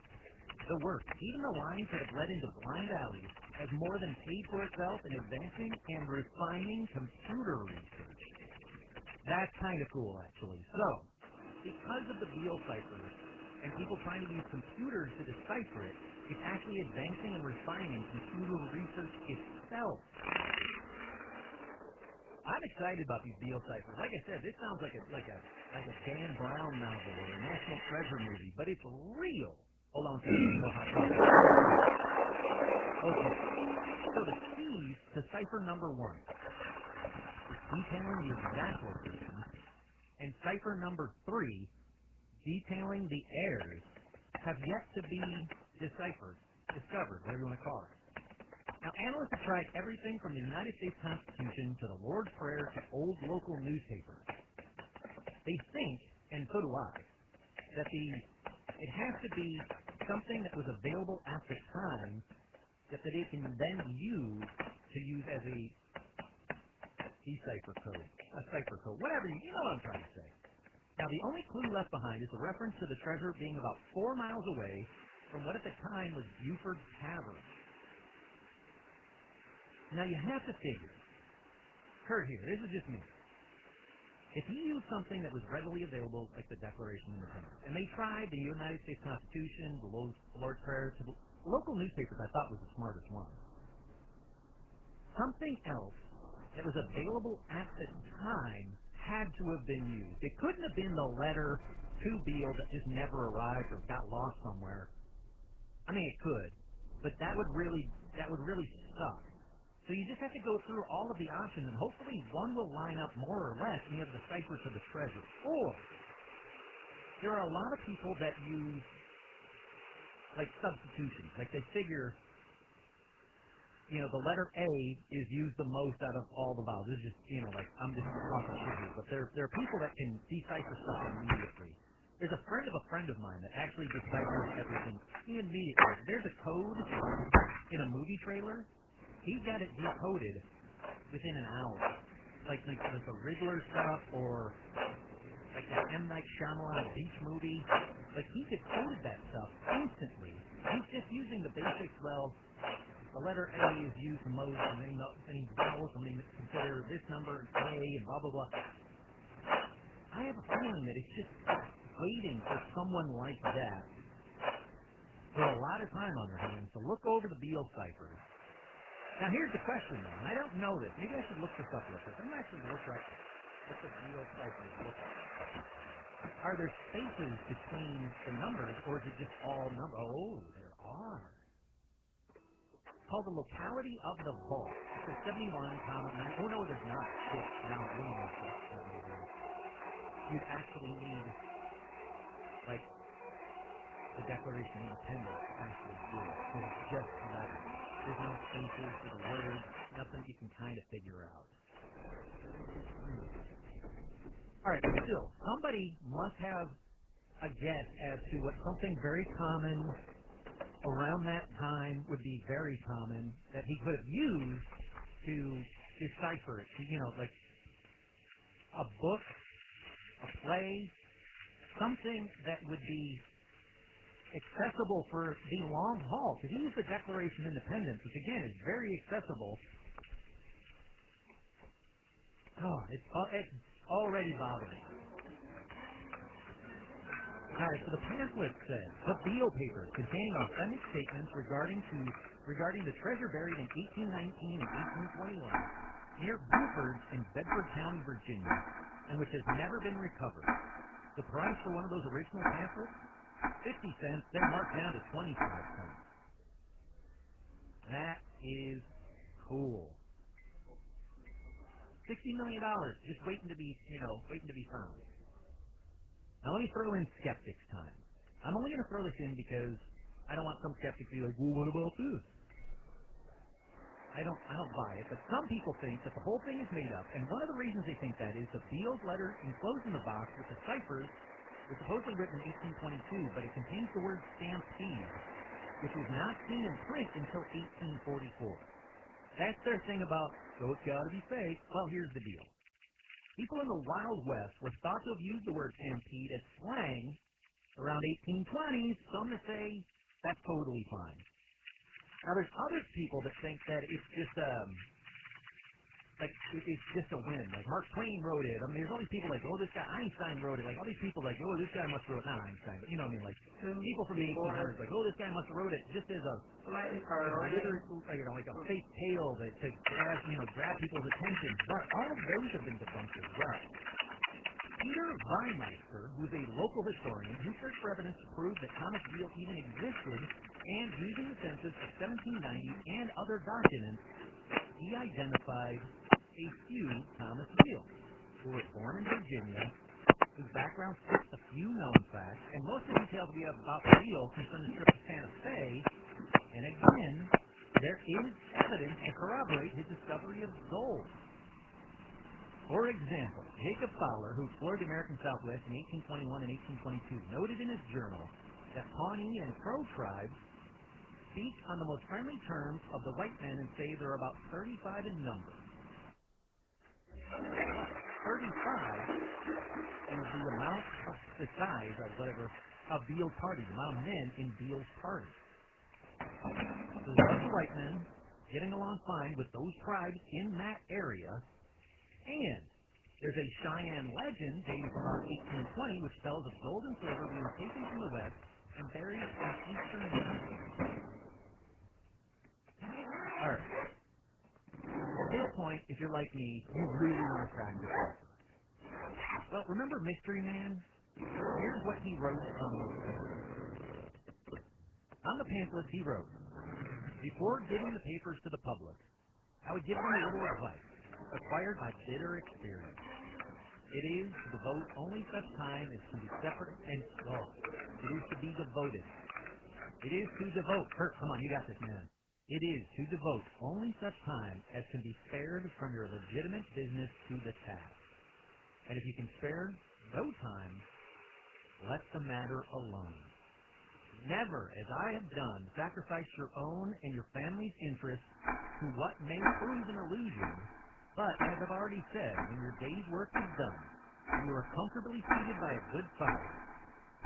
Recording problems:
garbled, watery; badly; nothing above 3 kHz
household noises; very loud; throughout; 2 dB above the speech

